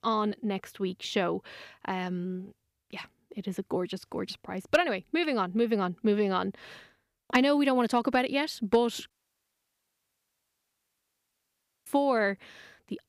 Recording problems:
audio cutting out; at 9 s for 3 s

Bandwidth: 15 kHz